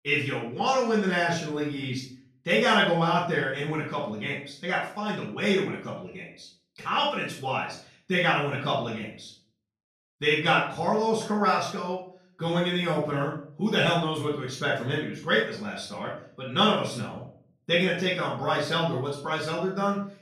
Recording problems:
off-mic speech; far
room echo; noticeable; dies away in 0.4 s

